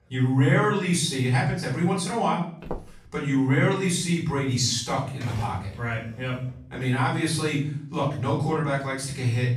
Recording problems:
off-mic speech; far
room echo; noticeable; dies away in 0.6 s
footsteps; faint; at 2.5 s; peak 10 dB below the speech
keyboard typing; faint; from 5 to 6.5 s; peak 15 dB below the speech

